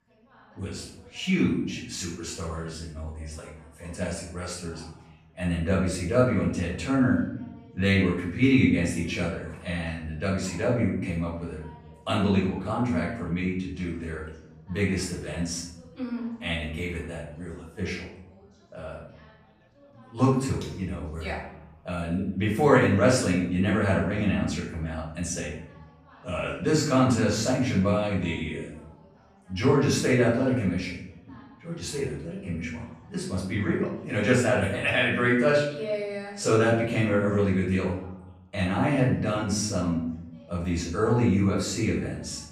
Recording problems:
off-mic speech; far
room echo; noticeable; dies away in 0.7 s
background chatter; faint; throughout; 2 voices, 30 dB below the speech

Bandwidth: 15 kHz